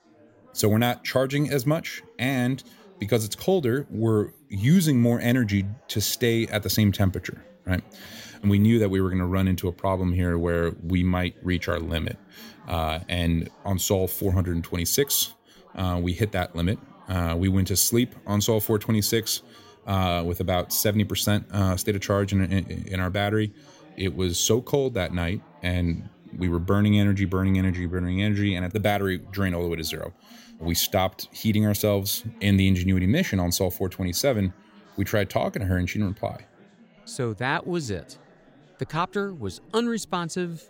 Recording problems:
background chatter; faint; throughout; 4 voices, 25 dB below the speech

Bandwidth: 16 kHz